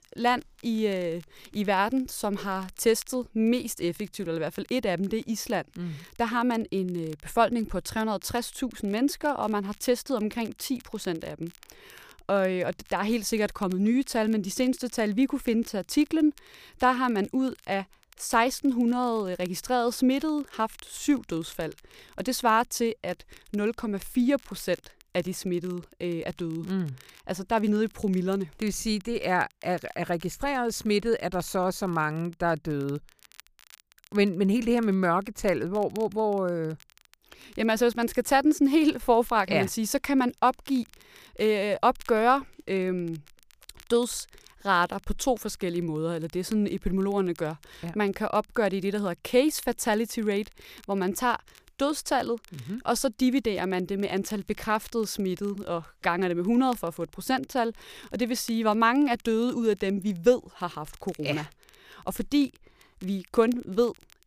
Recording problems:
crackle, like an old record; faint; 30 dB below the speech

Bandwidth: 15 kHz